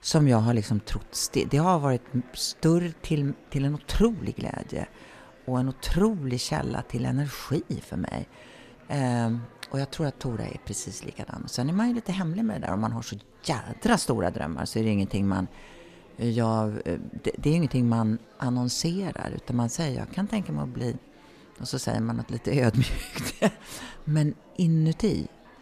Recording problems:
murmuring crowd; faint; throughout; 25 dB below the speech

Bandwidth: 14 kHz